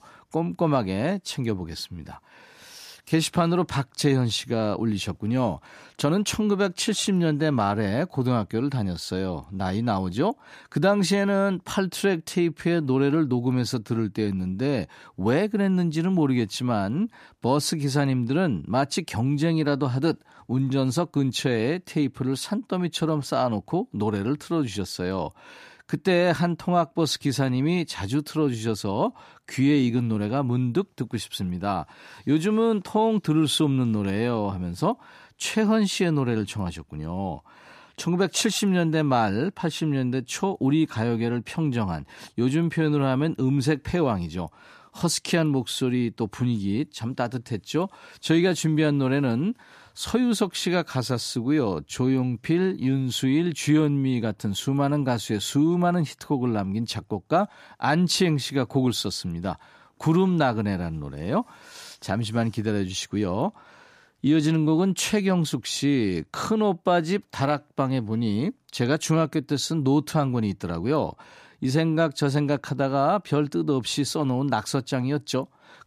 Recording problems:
none

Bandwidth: 14.5 kHz